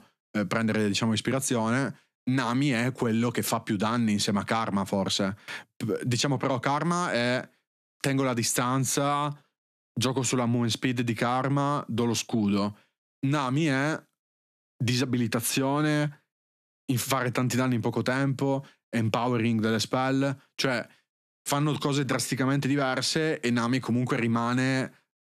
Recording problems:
squashed, flat; somewhat

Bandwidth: 14 kHz